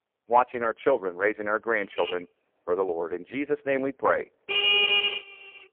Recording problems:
phone-call audio; poor line
traffic noise; very loud; from 2 s on; 4 dB above the speech

